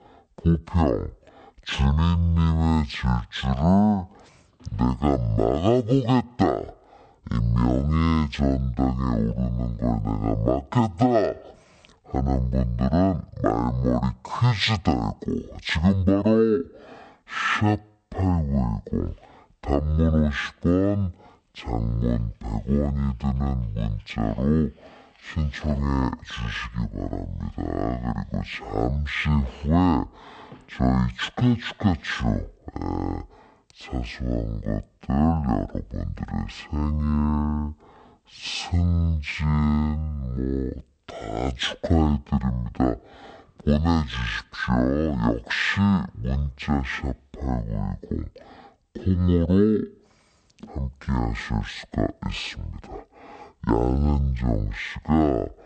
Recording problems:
wrong speed and pitch; too slow and too low; 0.5 times normal speed

